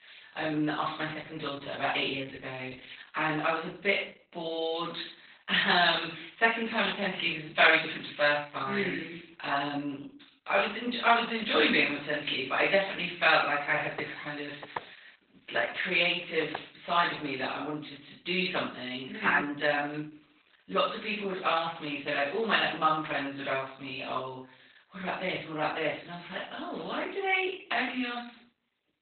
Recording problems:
off-mic speech; far
garbled, watery; badly; nothing above 4 kHz
thin; somewhat; fading below 900 Hz
room echo; slight; dies away in 0.4 s
footsteps; faint; from 14 to 17 s; peak 10 dB below the speech

